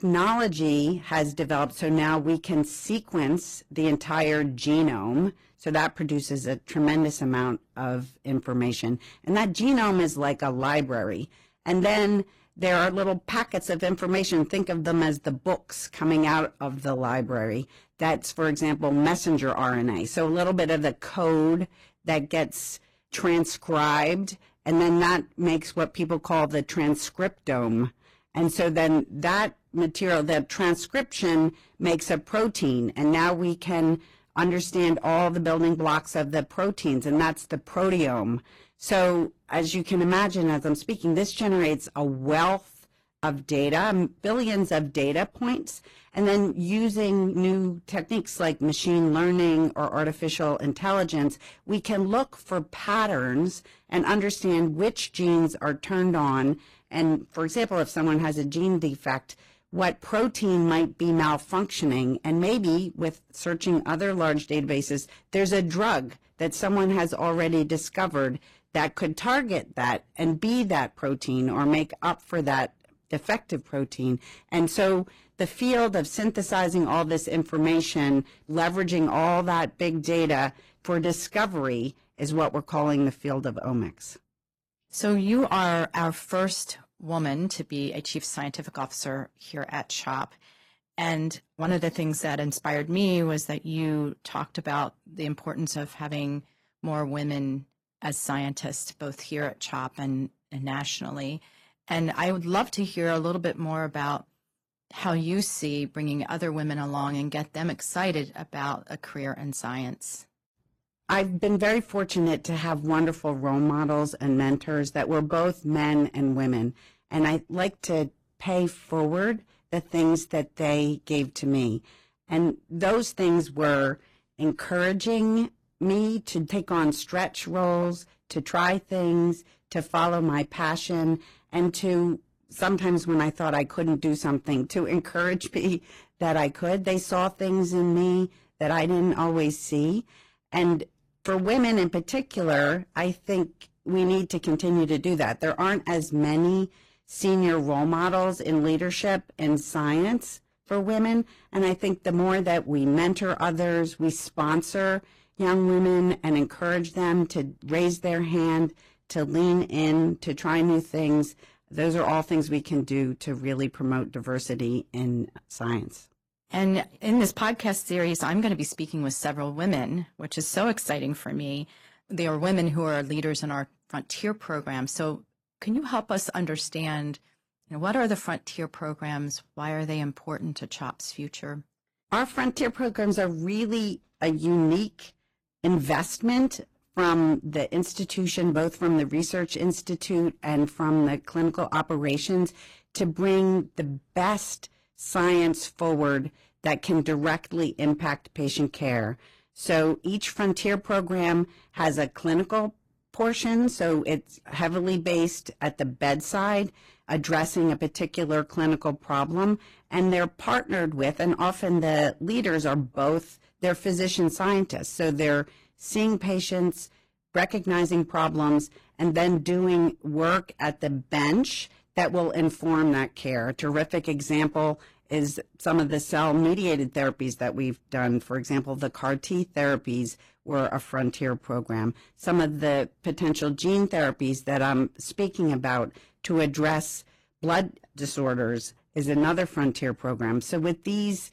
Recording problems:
distortion; slight; 8% of the sound clipped
garbled, watery; slightly; nothing above 14.5 kHz

